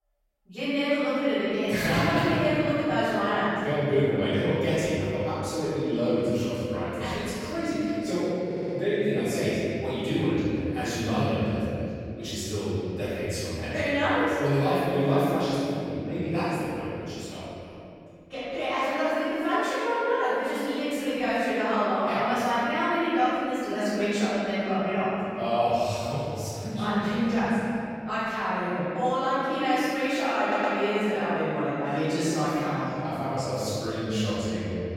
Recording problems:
room echo; strong; dies away in 2.7 s
off-mic speech; far
audio stuttering; at 8.5 s and at 30 s

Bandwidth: 16 kHz